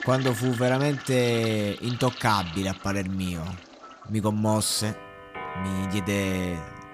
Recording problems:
household noises; noticeable; throughout; 10 dB below the speech

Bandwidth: 15 kHz